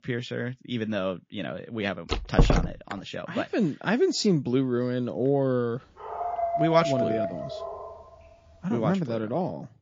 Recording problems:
garbled, watery; slightly; nothing above 7.5 kHz
door banging; loud; at 2 s; peak 4 dB above the speech
dog barking; loud; from 6 to 8 s; peak 2 dB above the speech

